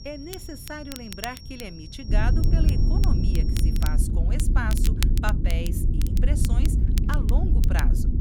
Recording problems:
high-pitched whine; loud; until 4 s; 5.5 kHz, 9 dB below the speech
low rumble; loud; from 2 s on; 3 dB below the speech
crackle, like an old record; loud; 5 dB below the speech
wind noise on the microphone; occasional gusts; 10 dB below the speech

